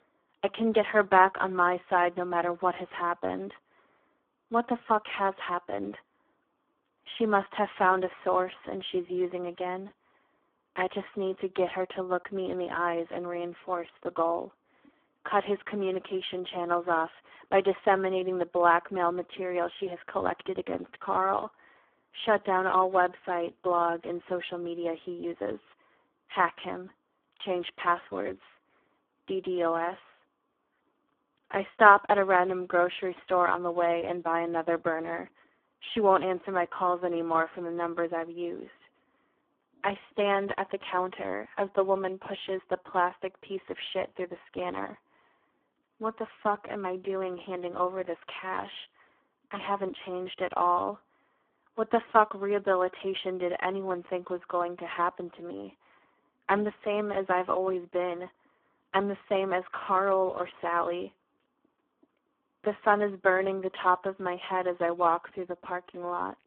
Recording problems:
phone-call audio; poor line

